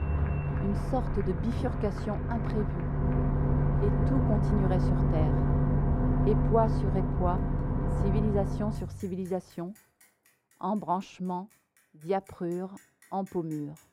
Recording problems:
muffled; very; fading above 2.5 kHz
traffic noise; very loud; throughout; 4 dB above the speech
crowd noise; noticeable; until 8 s; 20 dB below the speech

